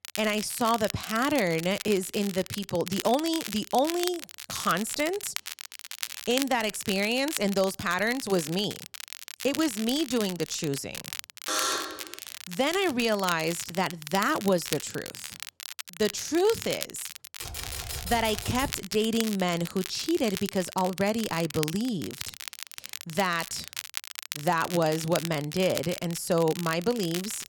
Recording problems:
crackle, like an old record; loud; 9 dB below the speech
alarm; loud; at 11 s; peak 1 dB above the speech
keyboard typing; noticeable; from 17 to 19 s; peak 7 dB below the speech

